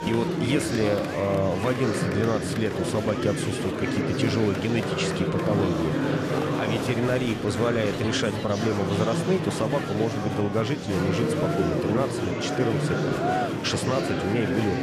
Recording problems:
murmuring crowd; very loud; throughout; as loud as the speech

